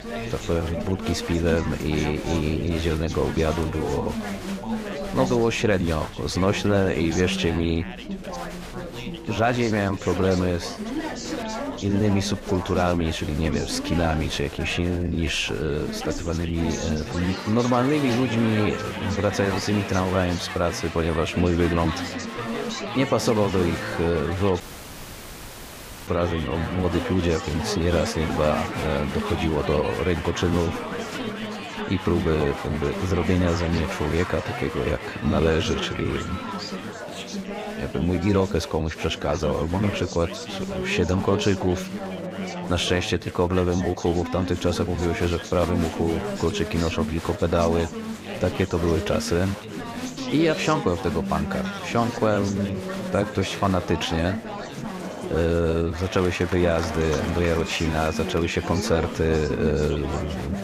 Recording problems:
chatter from many people; loud; throughout; 7 dB below the speech
audio cutting out; at 25 s for 1.5 s

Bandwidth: 15 kHz